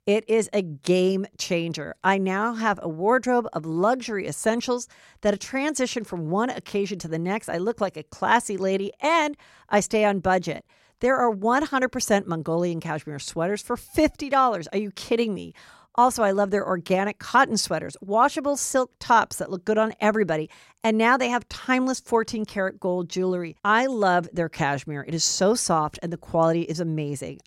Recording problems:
none

